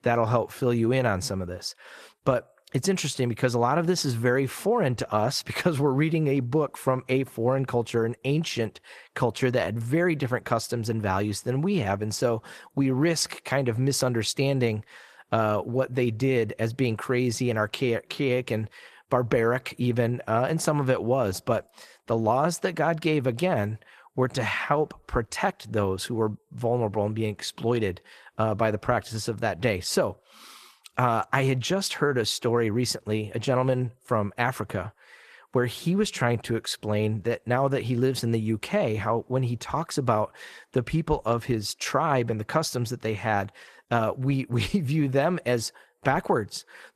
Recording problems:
garbled, watery; slightly; nothing above 14 kHz

